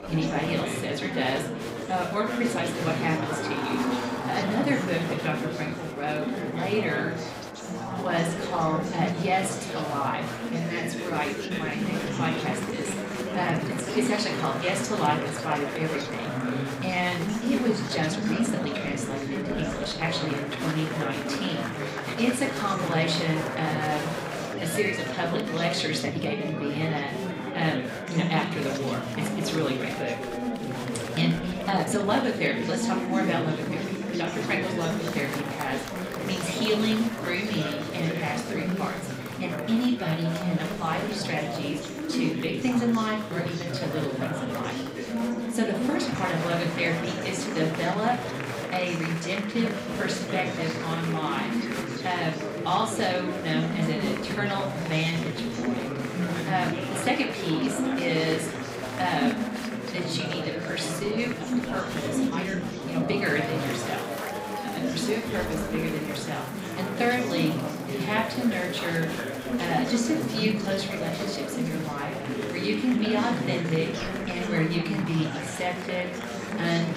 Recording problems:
room echo; slight; dies away in 0.4 s
off-mic speech; somewhat distant
chatter from many people; loud; throughout; 2 dB below the speech
uneven, jittery; strongly; from 1.5 s to 1:12

